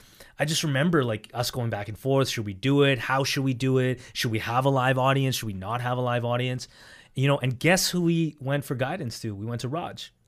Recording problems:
none

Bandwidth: 15 kHz